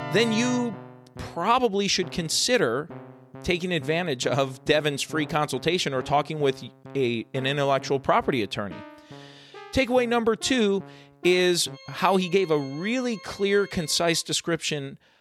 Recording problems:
background music; noticeable; throughout; 20 dB below the speech

